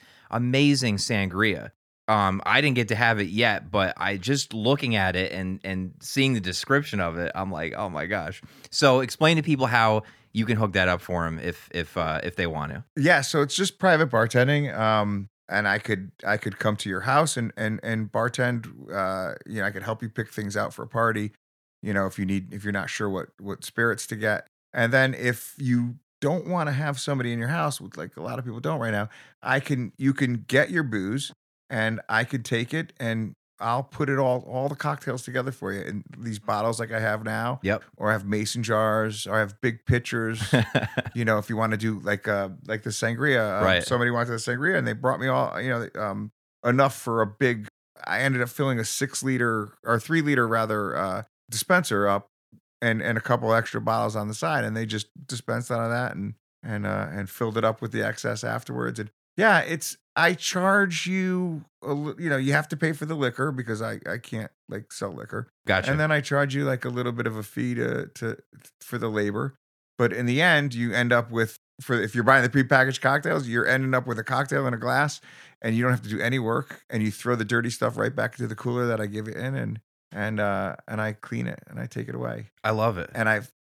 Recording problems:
none

